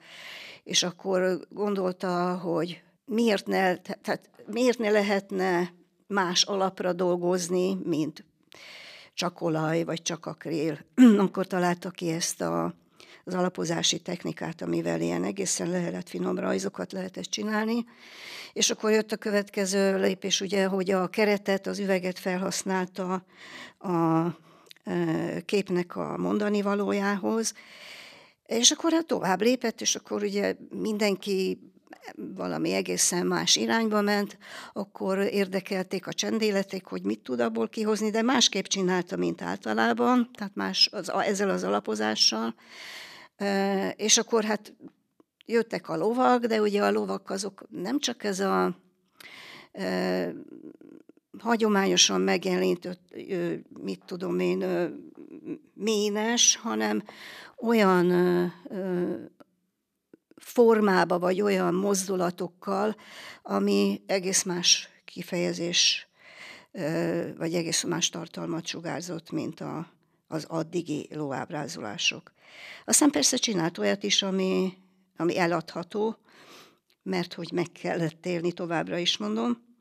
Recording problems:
none

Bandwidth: 14.5 kHz